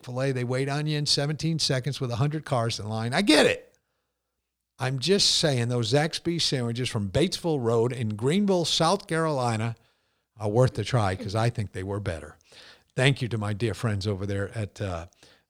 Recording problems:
none

